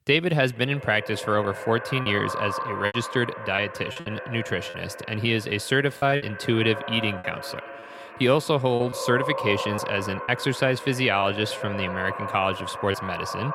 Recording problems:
echo of what is said; strong; throughout; 160 ms later, 9 dB below the speech
choppy; occasionally; 5% of the speech affected

